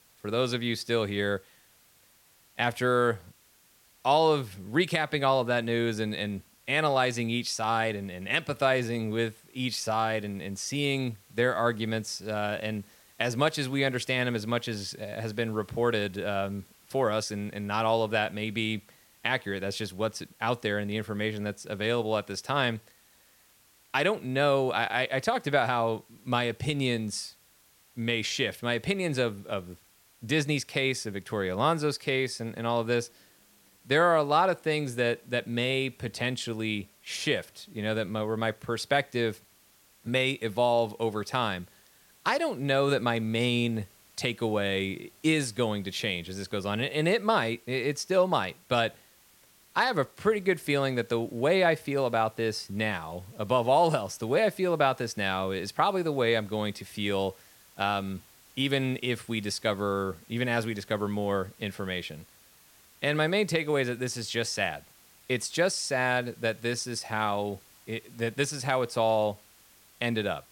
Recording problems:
hiss; faint; throughout; 30 dB below the speech

